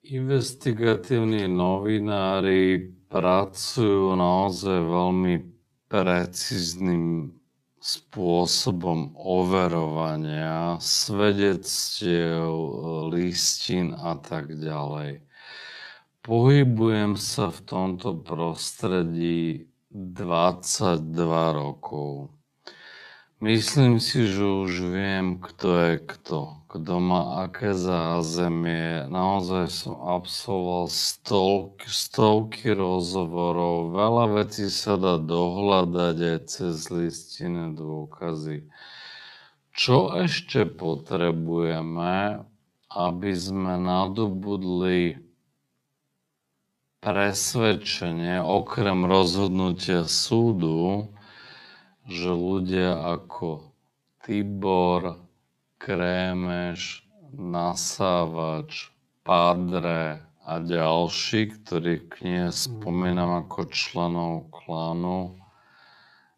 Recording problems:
wrong speed, natural pitch; too slow; 0.5 times normal speed

